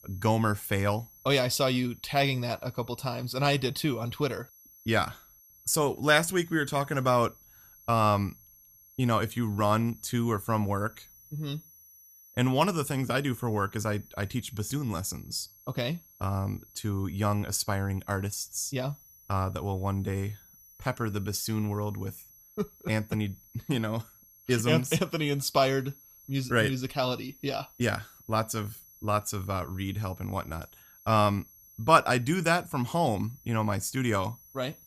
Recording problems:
high-pitched whine; faint; throughout; 11.5 kHz, 25 dB below the speech

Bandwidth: 15 kHz